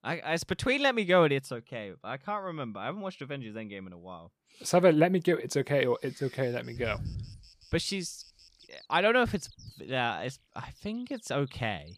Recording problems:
animal sounds; faint; from 6 s on; 25 dB below the speech

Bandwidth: 15 kHz